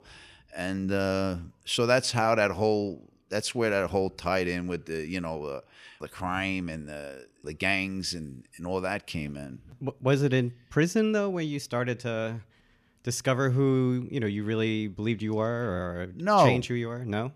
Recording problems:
none

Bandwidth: 14.5 kHz